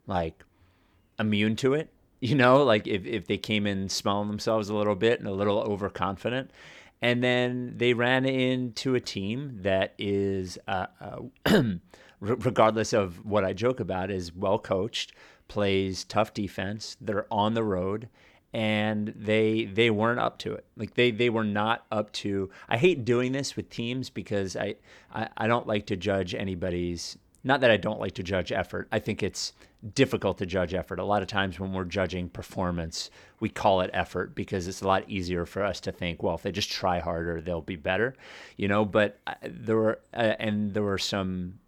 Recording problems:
none

